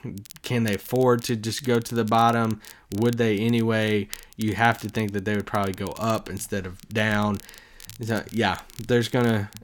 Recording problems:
crackle, like an old record; faint; 20 dB below the speech

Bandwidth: 17.5 kHz